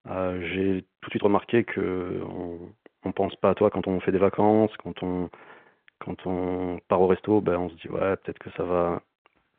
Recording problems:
phone-call audio
uneven, jittery; strongly; from 1 to 9 s

